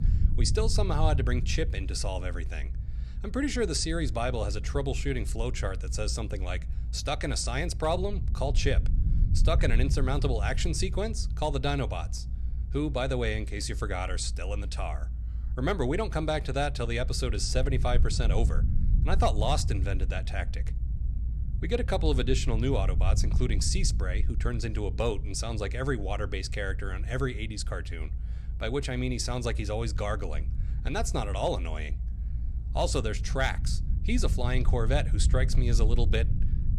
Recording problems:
low rumble; noticeable; throughout; 15 dB below the speech

